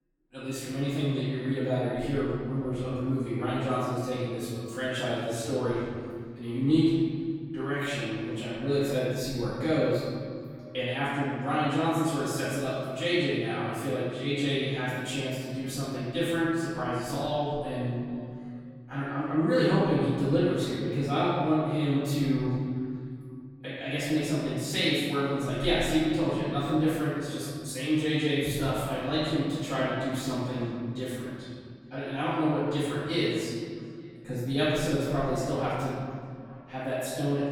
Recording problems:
room echo; strong; dies away in 2.1 s
off-mic speech; far
echo of what is said; faint; throughout; 430 ms later, 20 dB below the speech

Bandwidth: 17.5 kHz